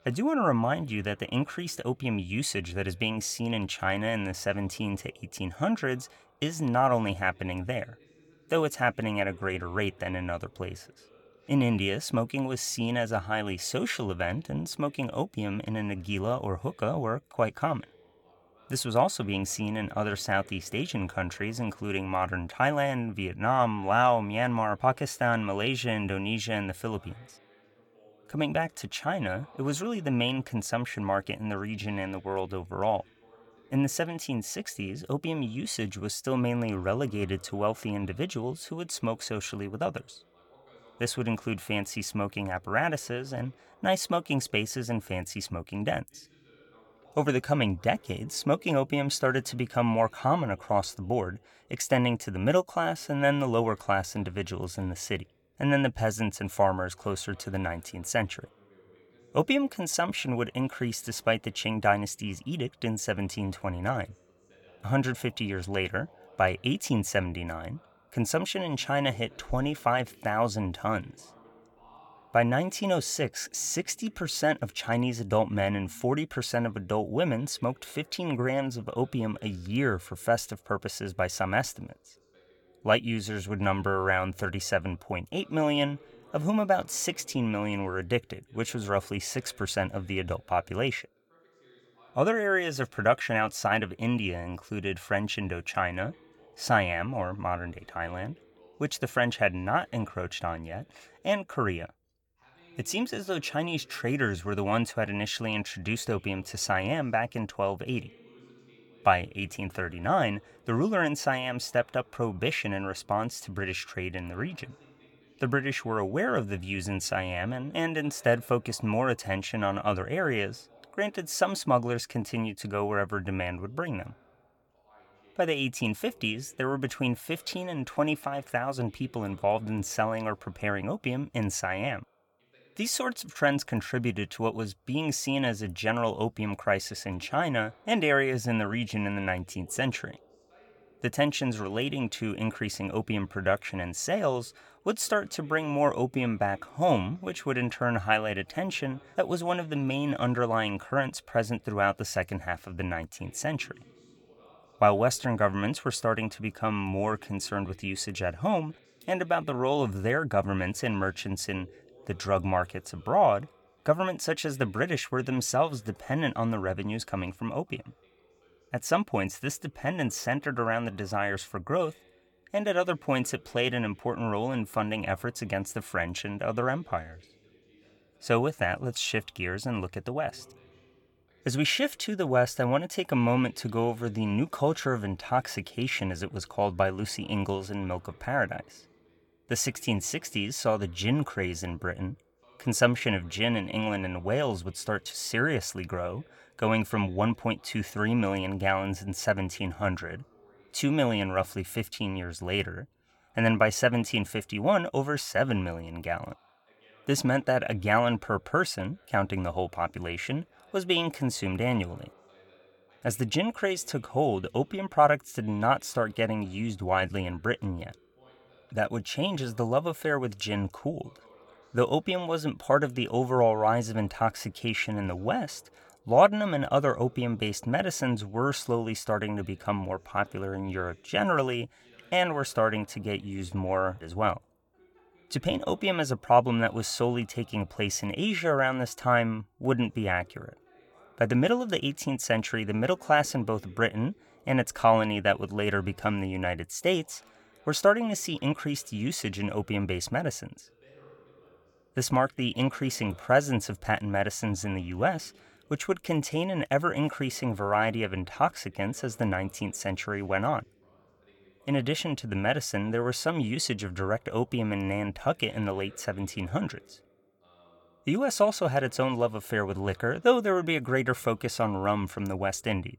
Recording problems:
voice in the background; faint; throughout; 30 dB below the speech

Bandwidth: 18 kHz